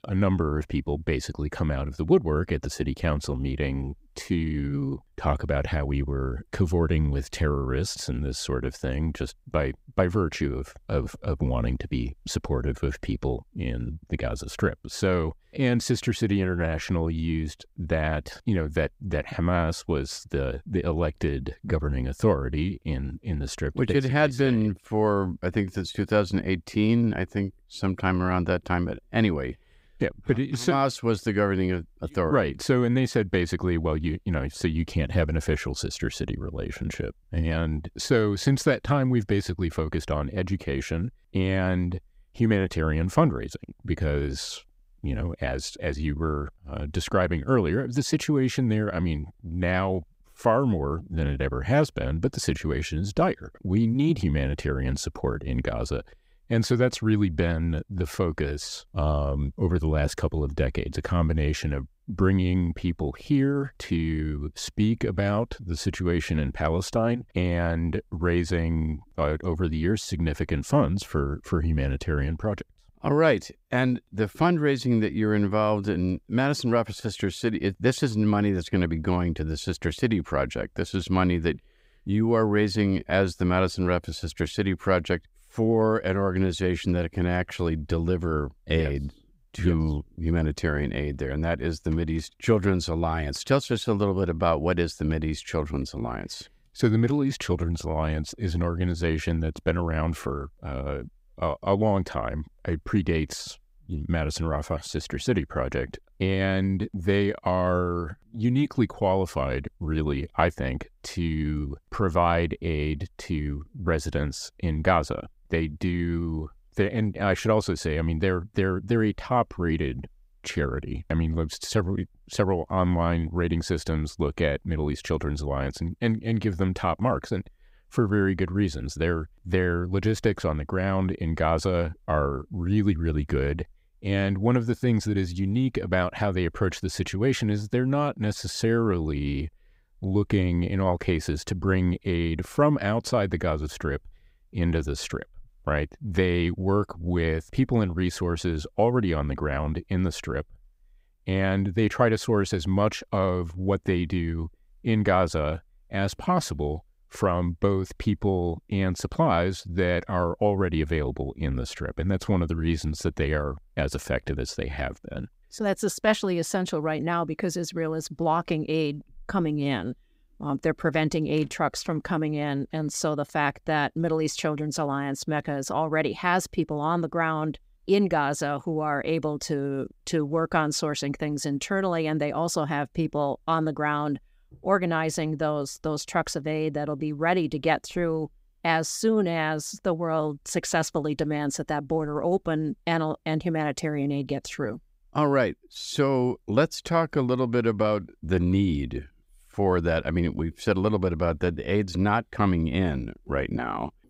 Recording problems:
none

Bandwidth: 15.5 kHz